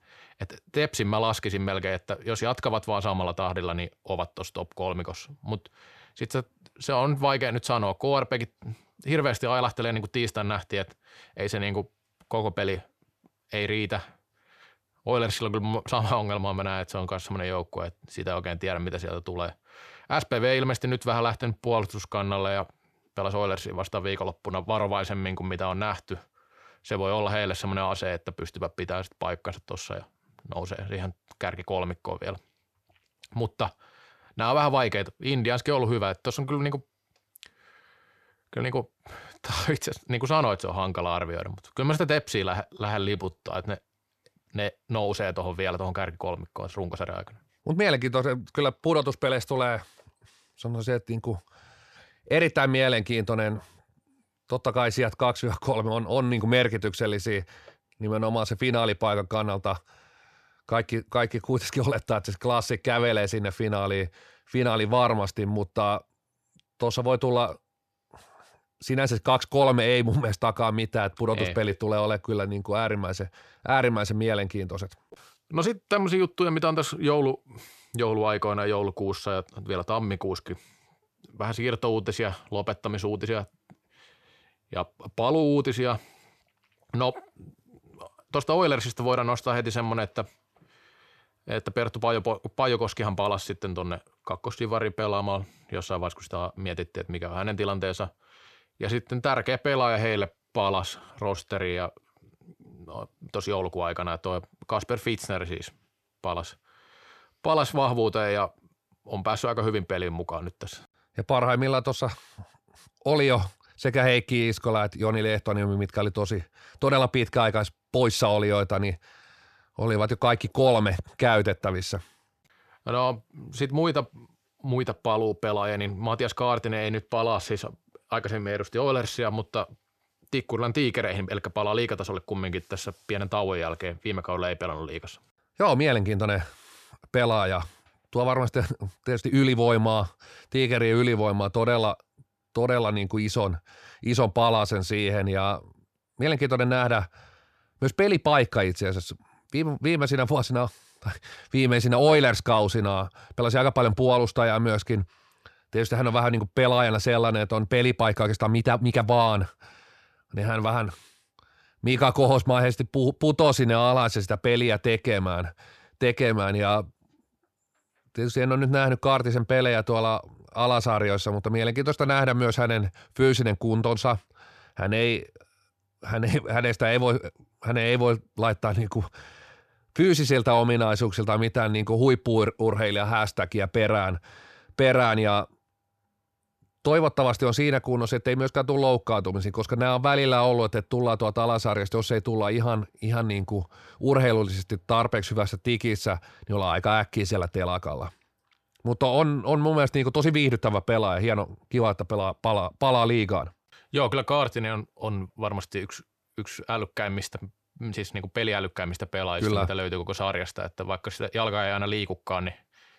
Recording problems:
uneven, jittery; strongly; from 21 s to 2:39

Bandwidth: 14 kHz